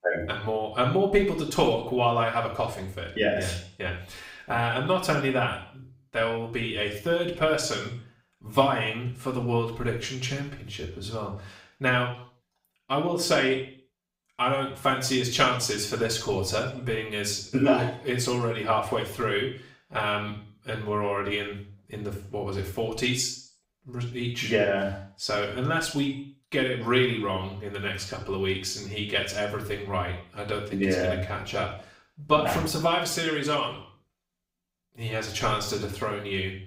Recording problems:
off-mic speech; far
room echo; noticeable; dies away in 0.5 s

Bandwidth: 15.5 kHz